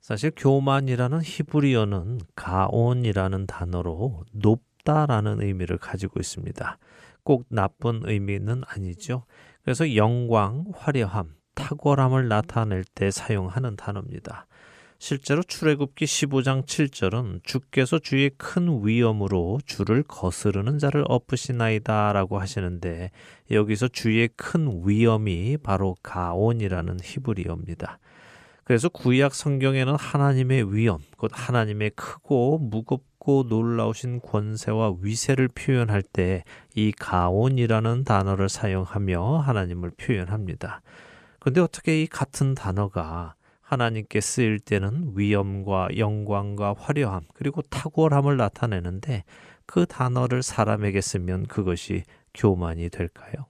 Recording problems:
none

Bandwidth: 14.5 kHz